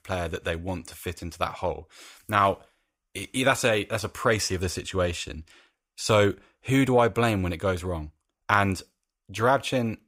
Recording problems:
none

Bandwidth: 15.5 kHz